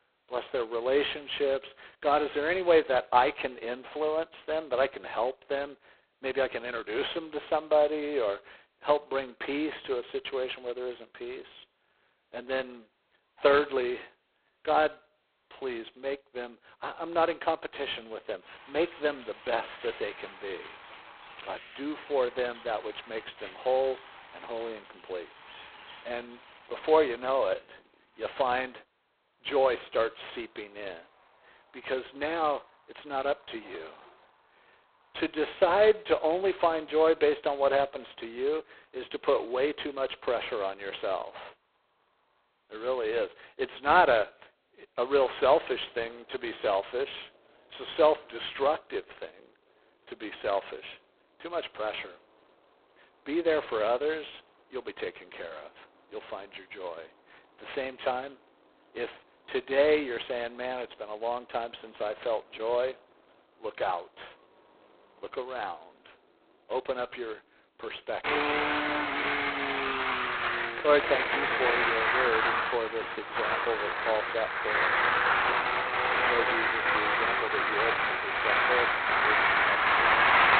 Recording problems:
phone-call audio; poor line; nothing above 4 kHz
traffic noise; very loud; throughout; 4 dB above the speech

